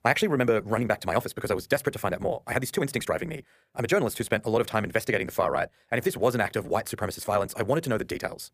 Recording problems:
wrong speed, natural pitch; too fast; 1.6 times normal speed

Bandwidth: 15 kHz